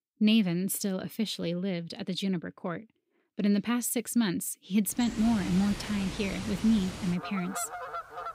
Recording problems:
animal sounds; loud; from 5 s on; 10 dB below the speech

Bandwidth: 15.5 kHz